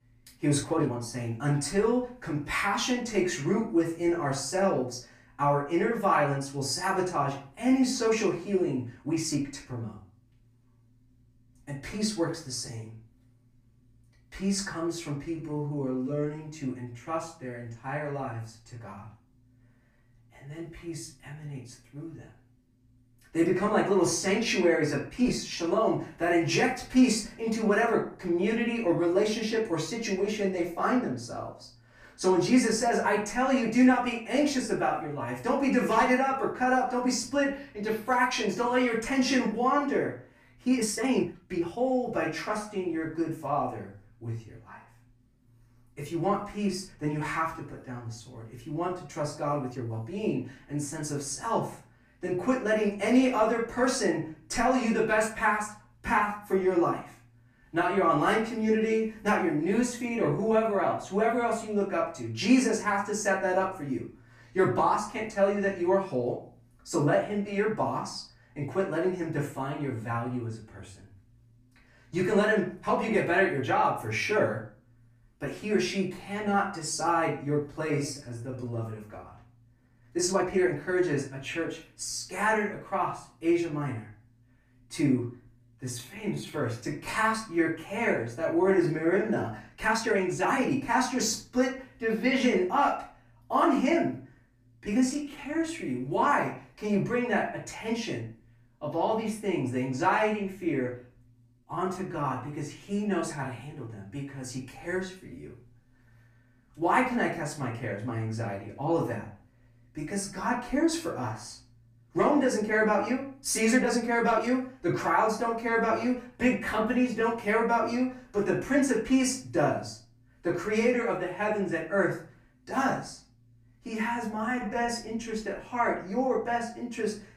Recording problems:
off-mic speech; far
room echo; slight; dies away in 0.4 s
uneven, jittery; strongly; from 0.5 s to 2:05

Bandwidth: 15 kHz